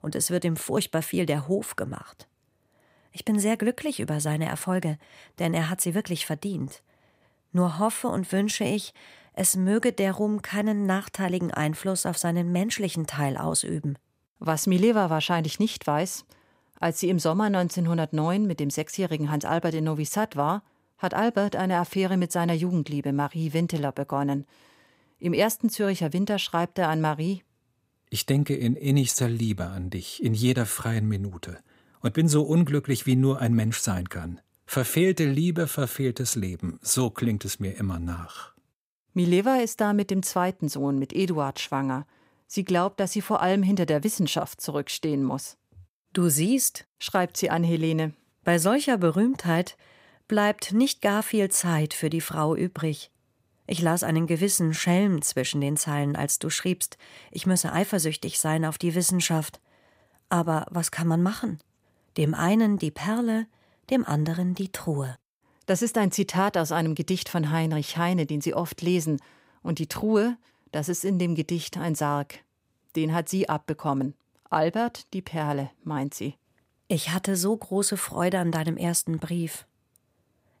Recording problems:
none

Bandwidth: 15.5 kHz